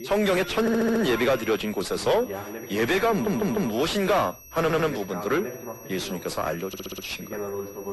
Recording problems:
distortion; heavy; 6 dB below the speech
garbled, watery; slightly; nothing above 11.5 kHz
high-pitched whine; noticeable; throughout; 6 kHz, 20 dB below the speech
voice in the background; noticeable; throughout; 15 dB below the speech
audio stuttering; 4 times, first at 0.5 s

